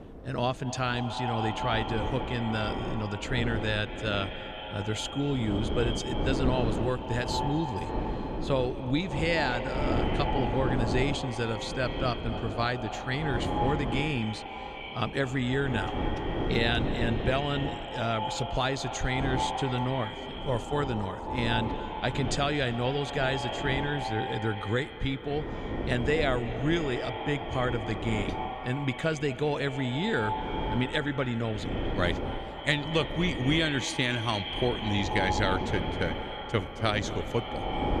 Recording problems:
echo of what is said; strong; throughout; 230 ms later, 6 dB below the speech
wind noise on the microphone; heavy; 8 dB below the speech

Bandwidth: 13.5 kHz